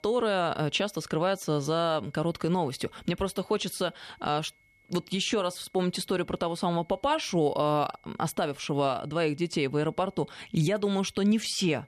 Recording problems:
high-pitched whine; faint; throughout; 2 kHz, 35 dB below the speech

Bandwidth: 13.5 kHz